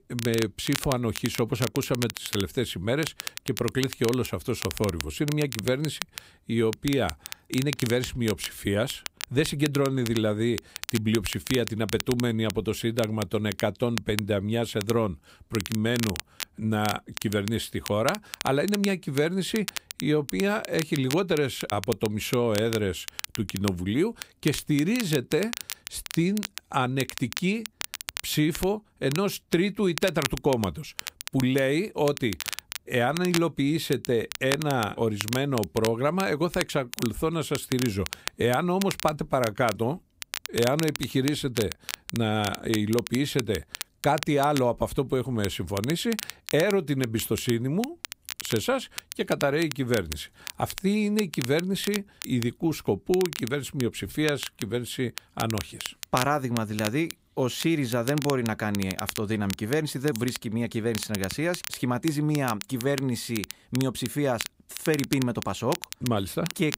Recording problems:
crackle, like an old record; loud; 9 dB below the speech

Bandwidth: 15.5 kHz